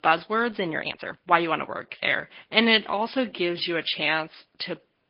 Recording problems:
garbled, watery; slightly; nothing above 5 kHz
thin; very slightly; fading below 400 Hz
high frequencies cut off; slight
uneven, jittery; strongly; from 1 to 4.5 s

